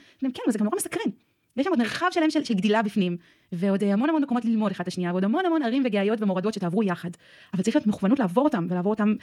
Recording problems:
wrong speed, natural pitch; too fast; 1.7 times normal speed

